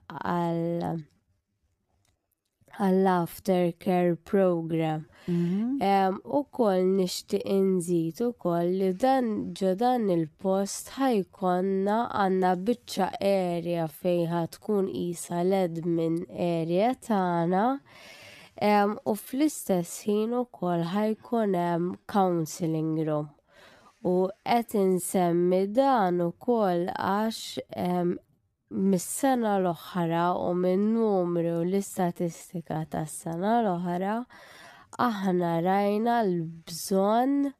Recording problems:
wrong speed, natural pitch; too slow; 0.6 times normal speed

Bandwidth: 14.5 kHz